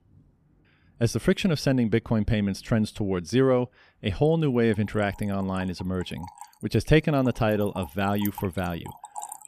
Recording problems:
rain or running water; noticeable; throughout; 20 dB below the speech

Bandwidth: 14.5 kHz